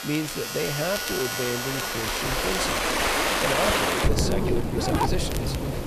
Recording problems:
echo of what is said; noticeable; throughout; 260 ms later, 15 dB below the speech
household noises; very loud; throughout; as loud as the speech
rain or running water; very loud; throughout; 4 dB above the speech
crackle, like an old record; noticeable; 10 dB below the speech
uneven, jittery; strongly; from 1 to 5 s

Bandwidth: 14.5 kHz